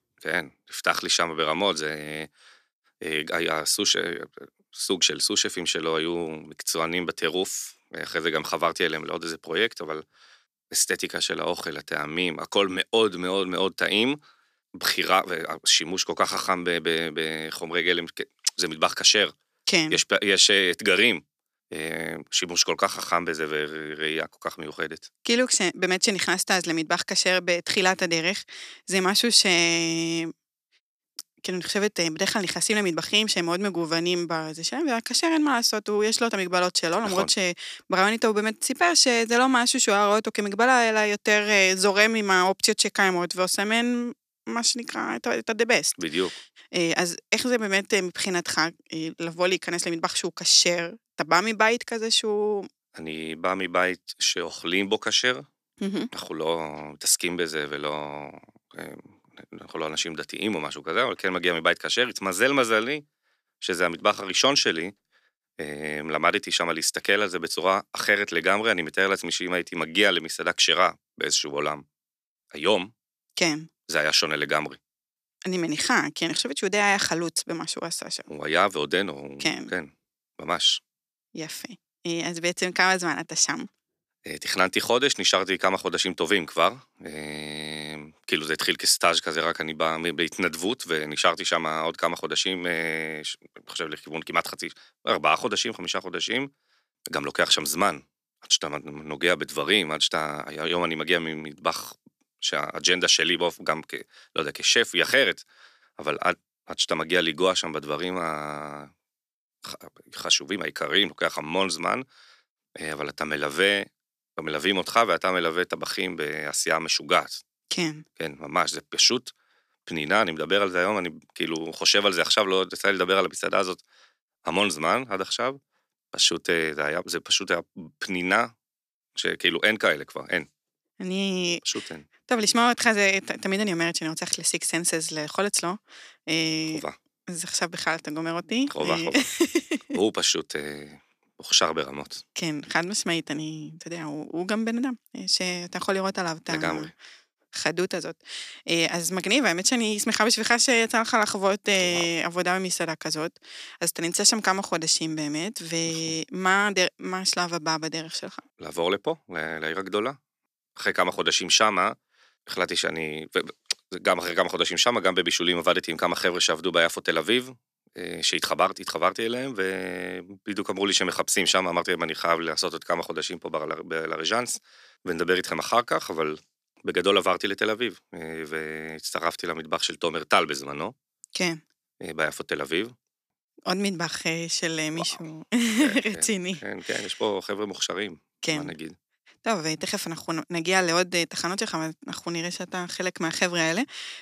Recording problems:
thin; very slightly; fading below 1 kHz

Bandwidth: 14.5 kHz